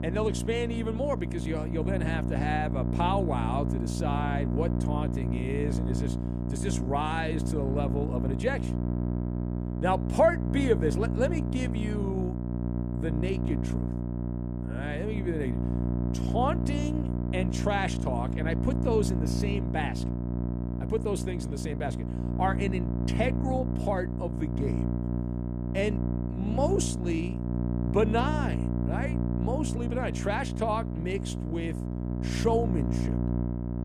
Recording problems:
electrical hum; loud; throughout; 60 Hz, 6 dB below the speech

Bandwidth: 13.5 kHz